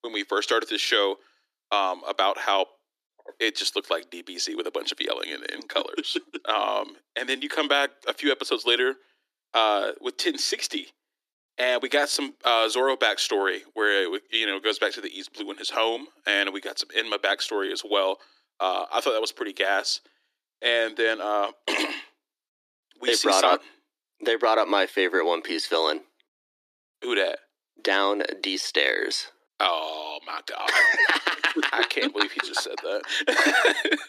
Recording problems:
thin; somewhat; fading below 300 Hz

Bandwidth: 14.5 kHz